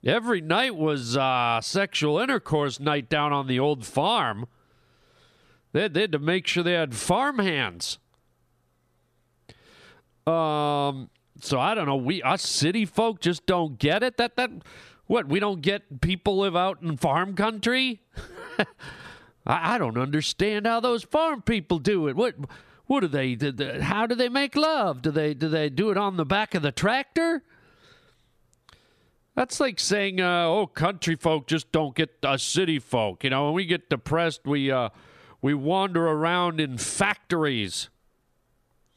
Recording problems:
squashed, flat; somewhat

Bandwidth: 14.5 kHz